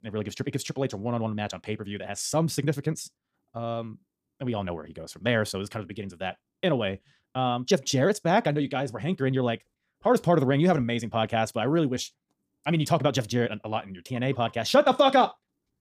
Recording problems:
wrong speed, natural pitch; too fast; 1.7 times normal speed

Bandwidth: 15 kHz